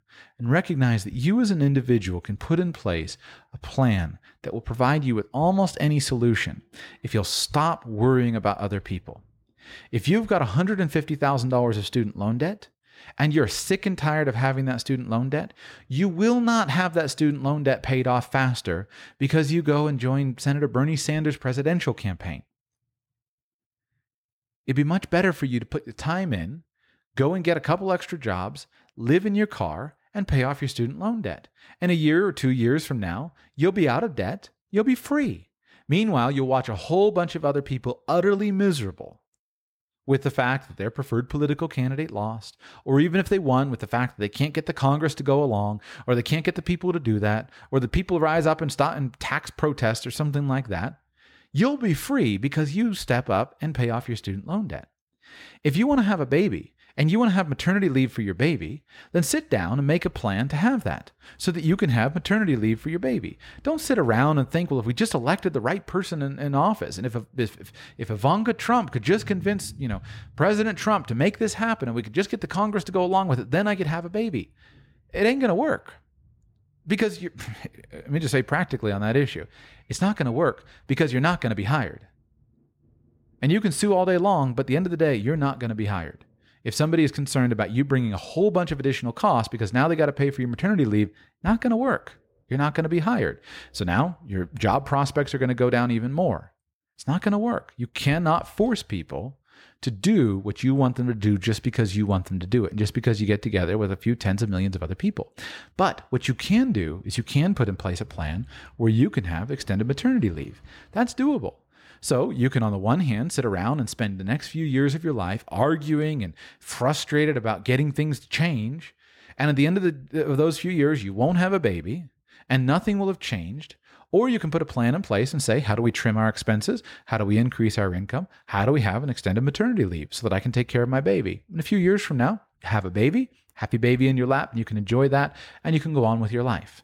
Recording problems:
none

